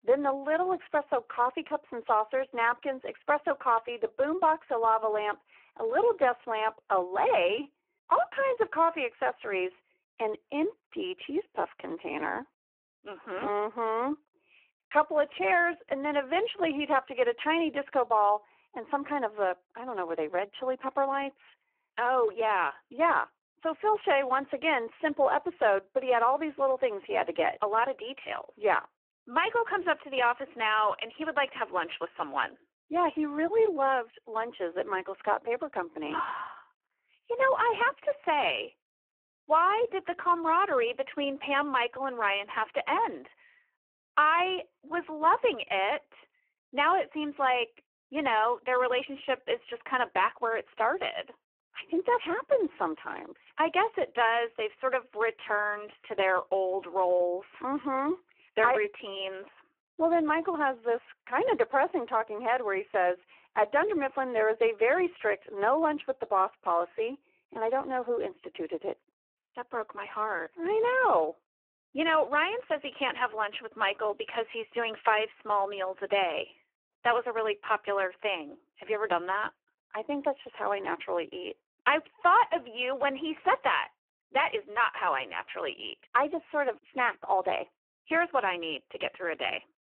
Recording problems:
phone-call audio; poor line

